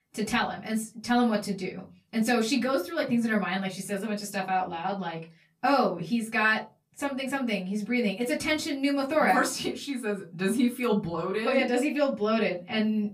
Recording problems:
off-mic speech; far
room echo; very slight; dies away in 0.3 s

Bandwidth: 15 kHz